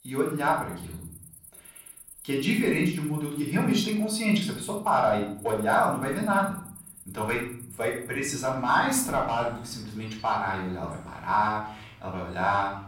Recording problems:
off-mic speech; far
room echo; noticeable; dies away in 0.7 s
animal sounds; noticeable; throughout; 20 dB below the speech

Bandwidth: 16 kHz